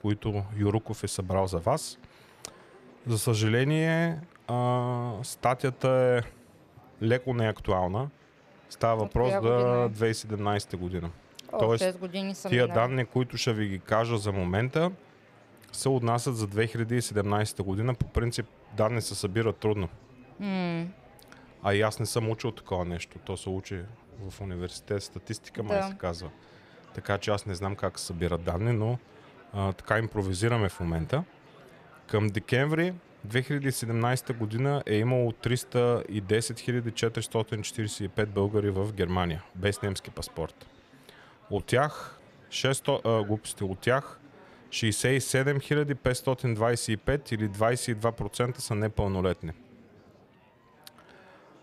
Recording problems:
murmuring crowd; faint; throughout; 25 dB below the speech

